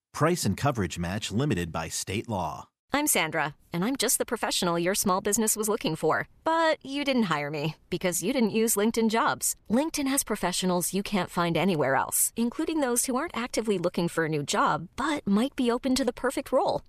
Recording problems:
none

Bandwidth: 14.5 kHz